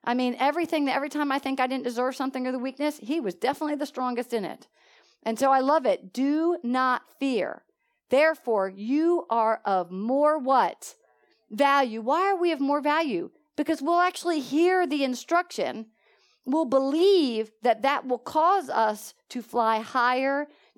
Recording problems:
none

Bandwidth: 17.5 kHz